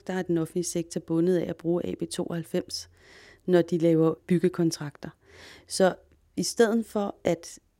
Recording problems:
none

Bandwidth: 16 kHz